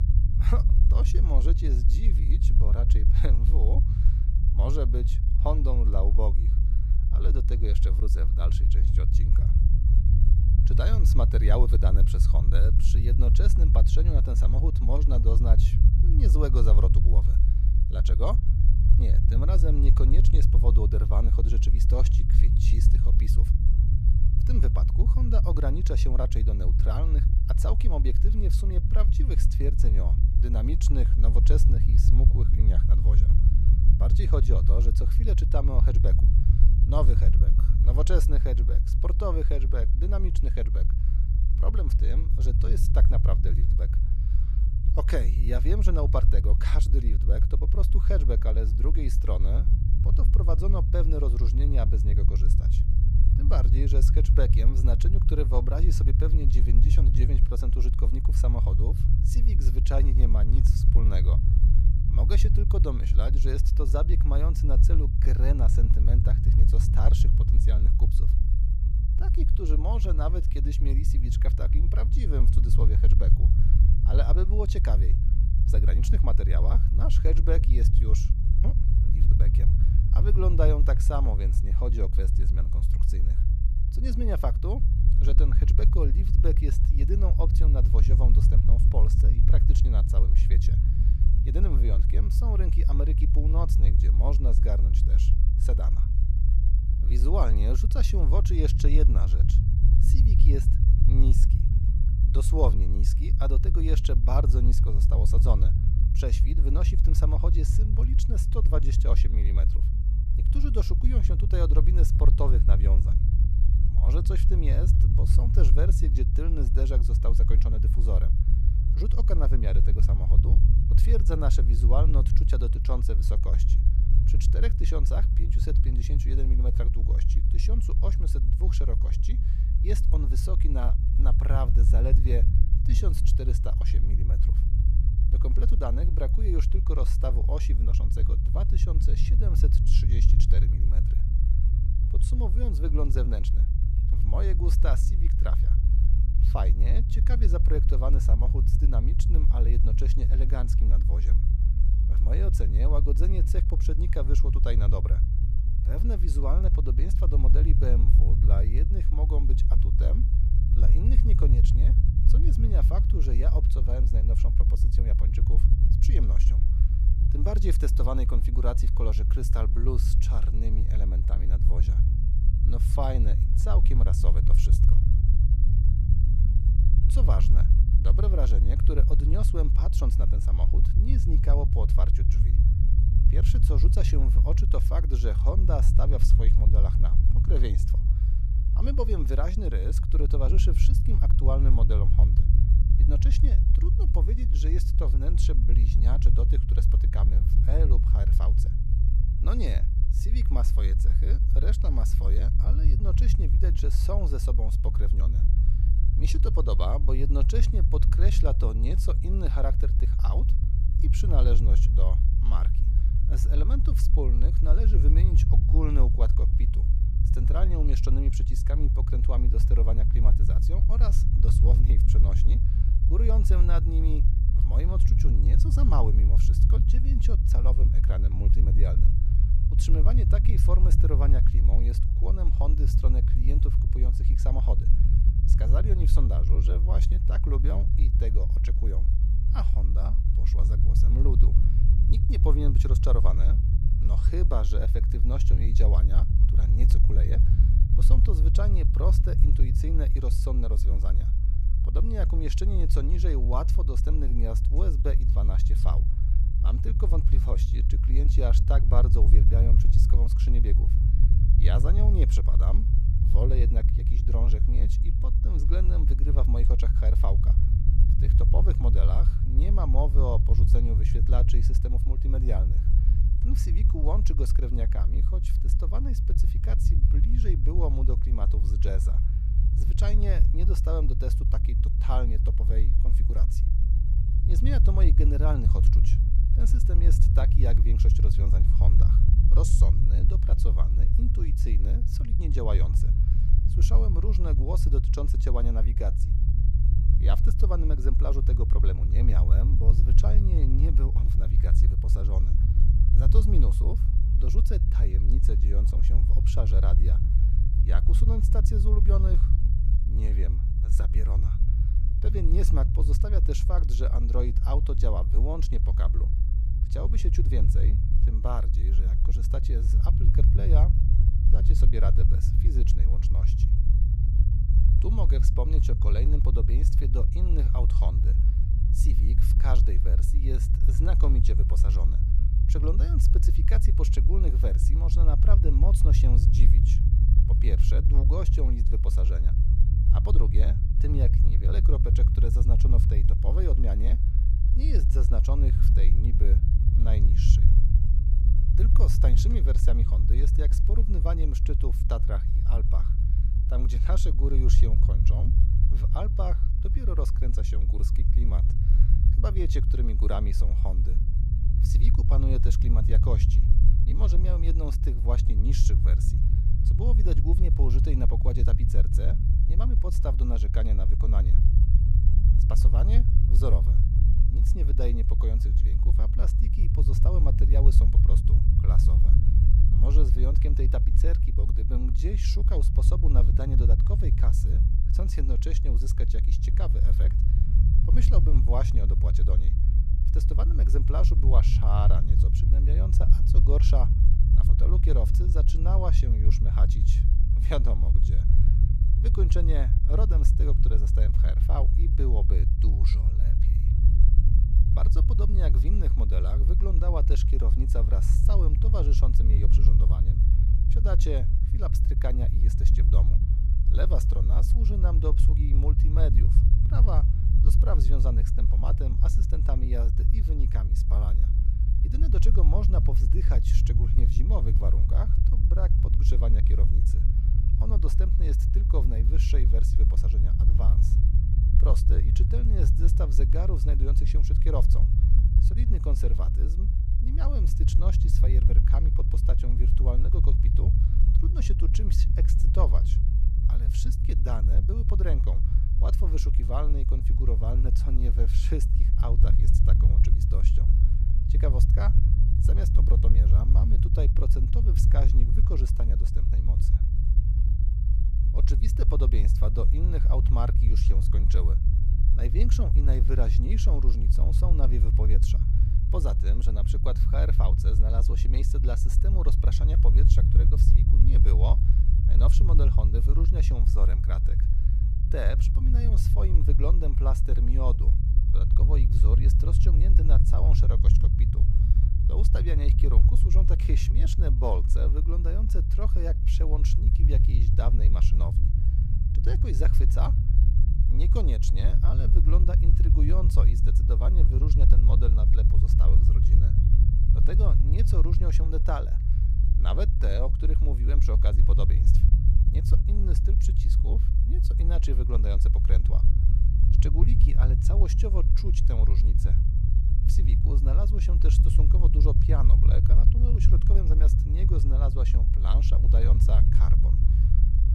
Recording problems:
low rumble; loud; throughout; 3 dB below the speech

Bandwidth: 14.5 kHz